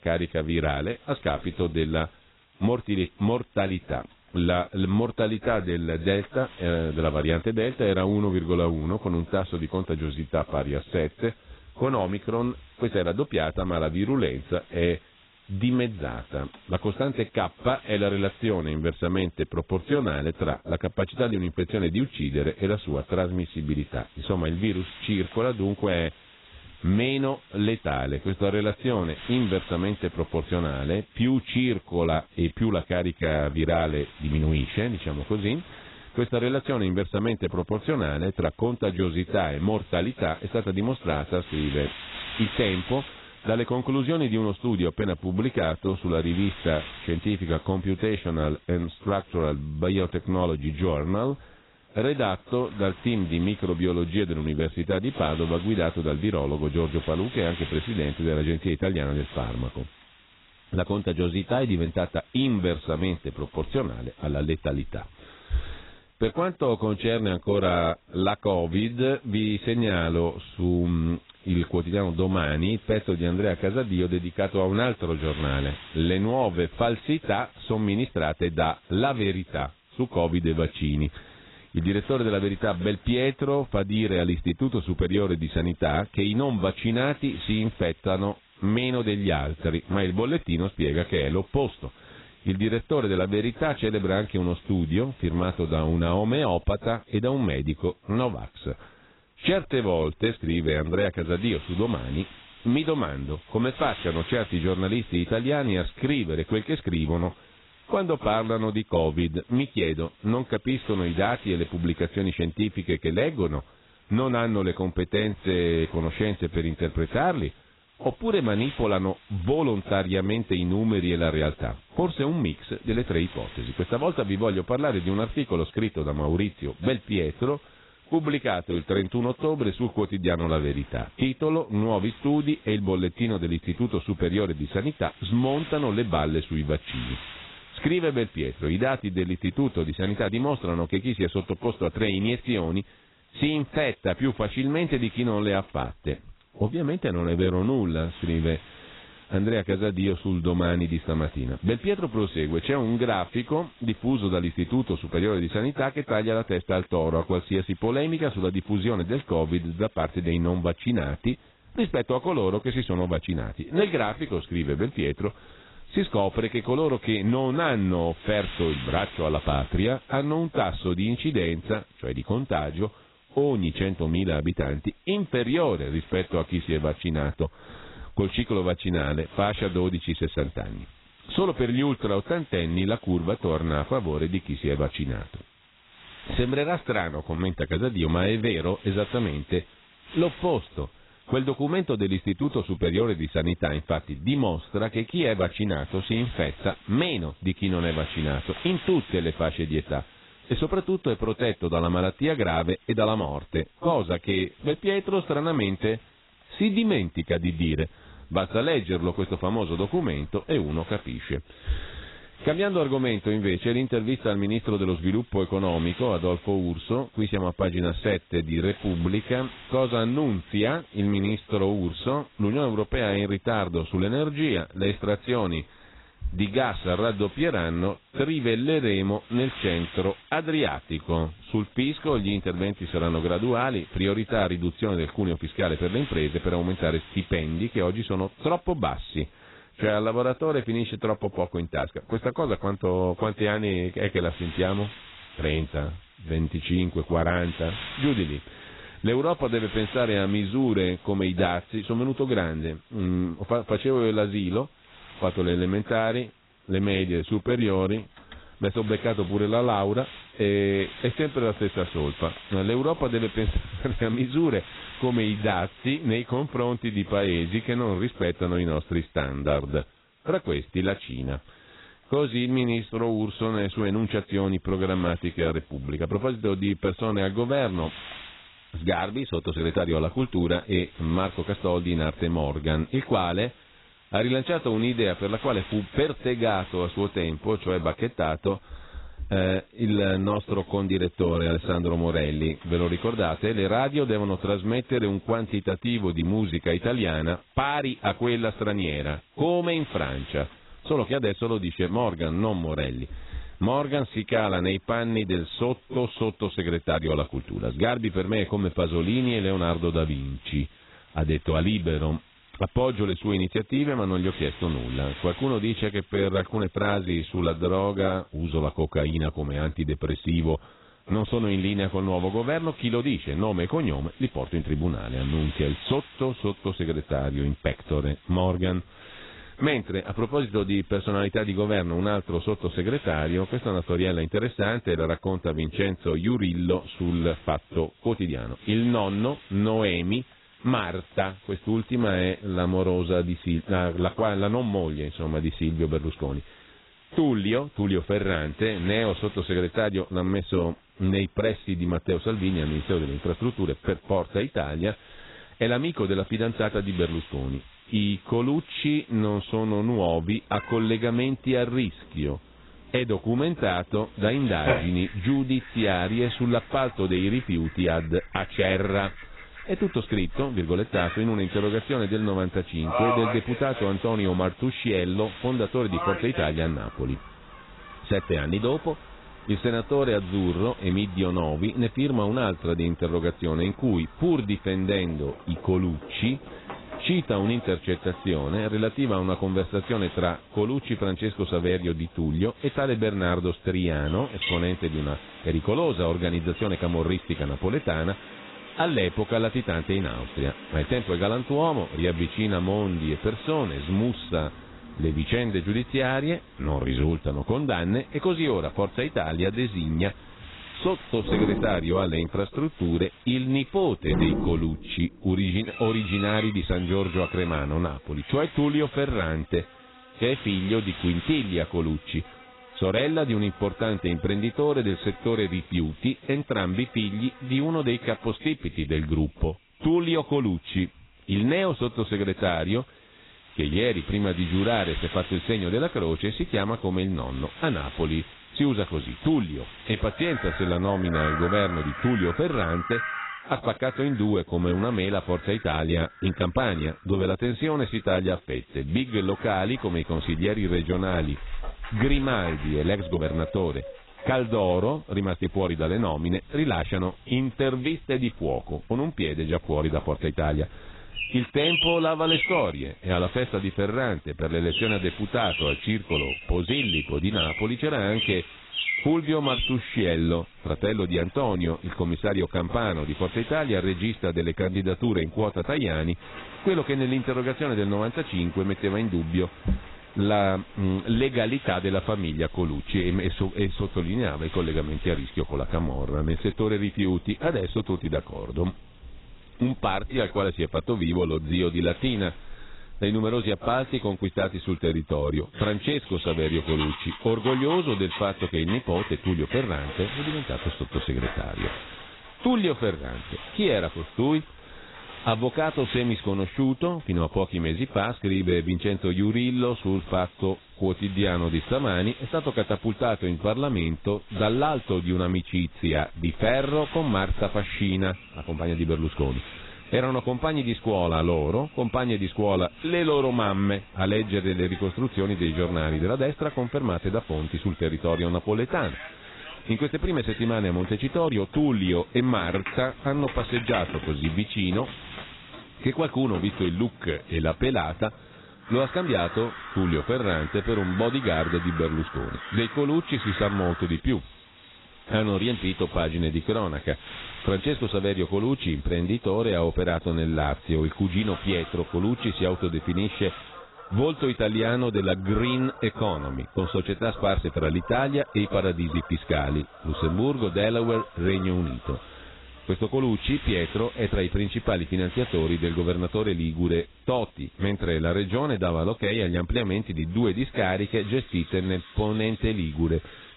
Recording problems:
garbled, watery; badly; nothing above 4 kHz
animal sounds; noticeable; from 6:00 on; 10 dB below the speech
wind noise on the microphone; occasional gusts; 20 dB below the speech

